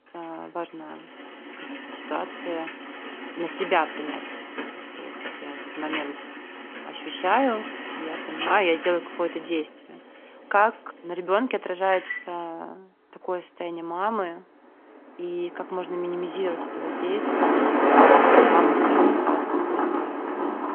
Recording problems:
phone-call audio
traffic noise; very loud; throughout; 5 dB above the speech

